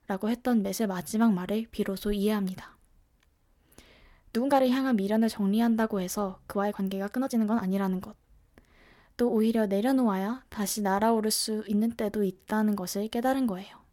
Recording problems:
uneven, jittery; strongly; from 0.5 to 13 s

